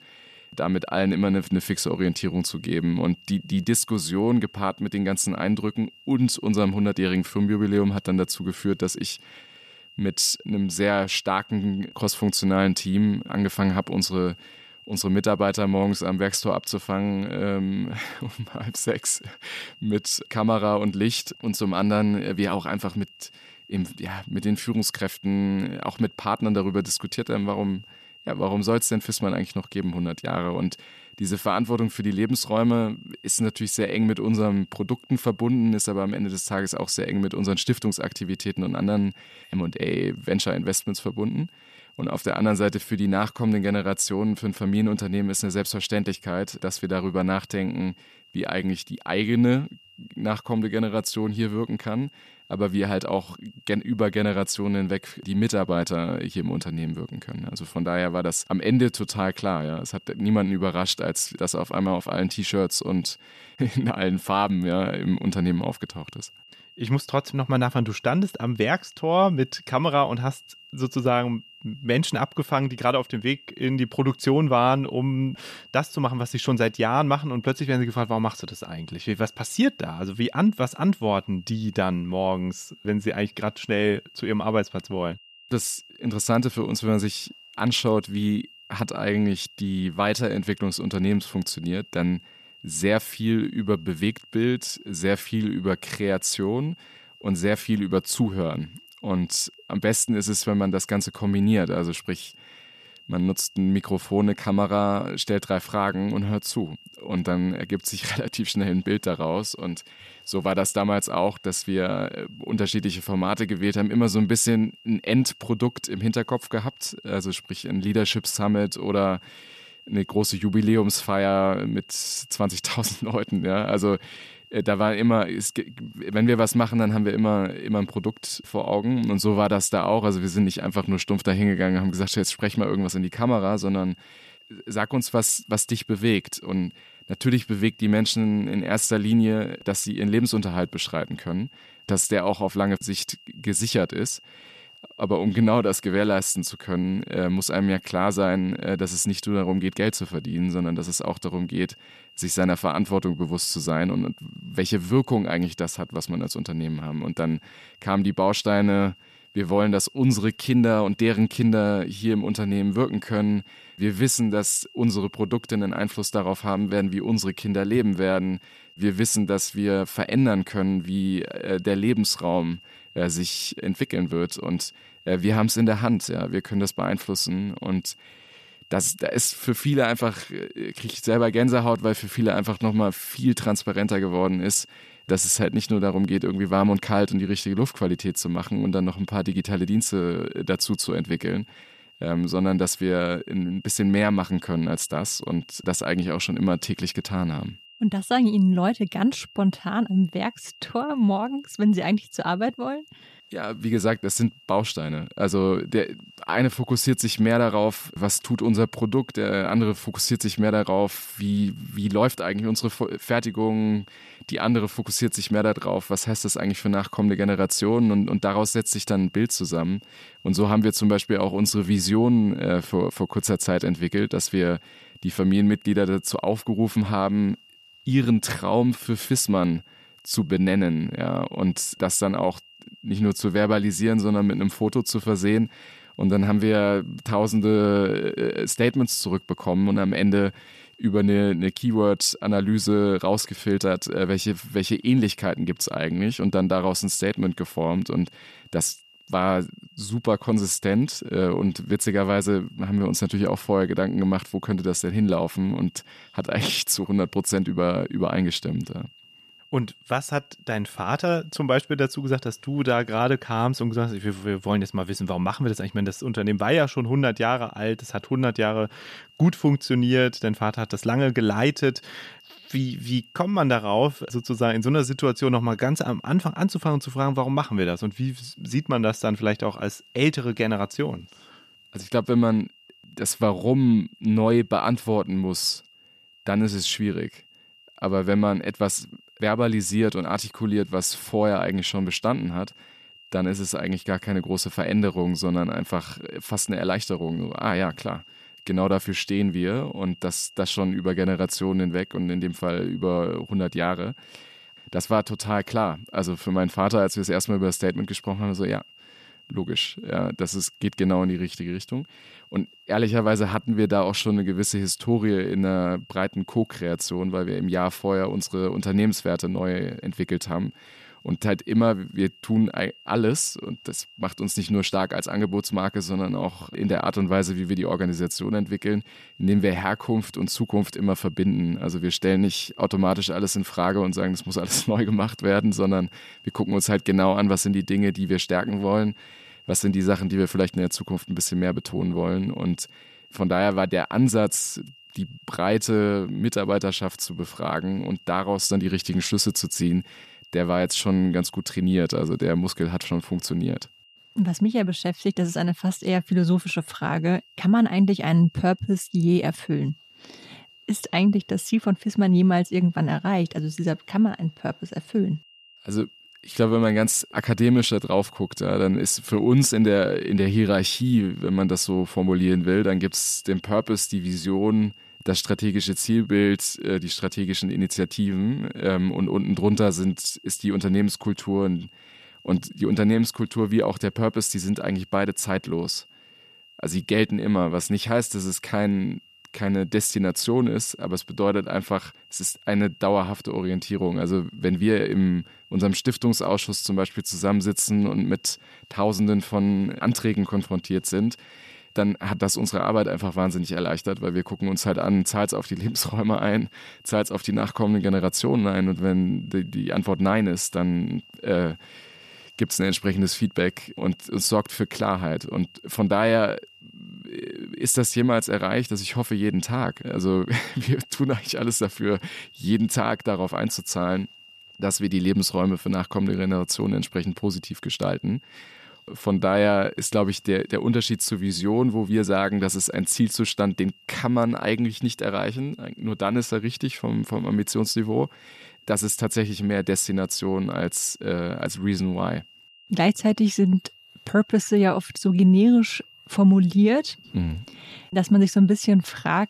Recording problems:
high-pitched whine; faint; throughout; 3 kHz, 25 dB below the speech

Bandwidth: 14 kHz